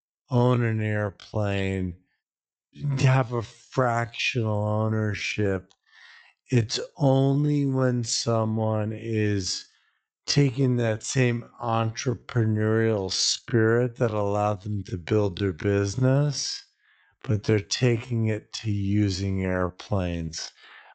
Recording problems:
wrong speed, natural pitch; too slow; 0.5 times normal speed
high frequencies cut off; noticeable; nothing above 8 kHz

